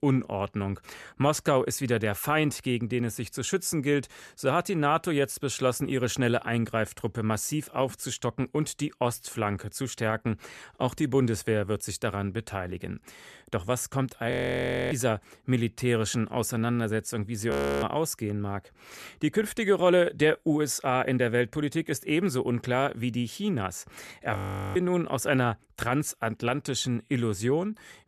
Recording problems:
audio freezing; at 14 s for 0.5 s, at 18 s and at 24 s

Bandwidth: 13.5 kHz